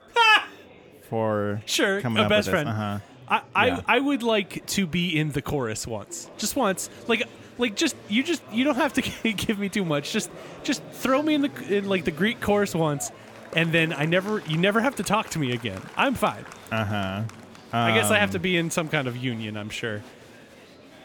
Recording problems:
murmuring crowd; noticeable; throughout; 20 dB below the speech

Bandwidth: 18.5 kHz